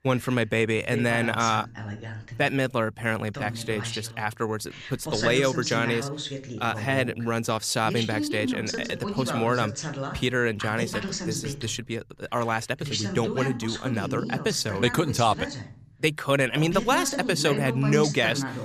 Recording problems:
voice in the background; loud; throughout; 6 dB below the speech

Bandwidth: 14.5 kHz